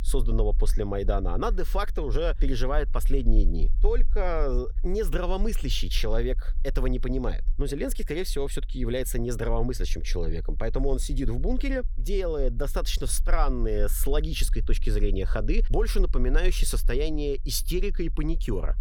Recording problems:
low rumble; faint; throughout; 25 dB below the speech

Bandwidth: 18.5 kHz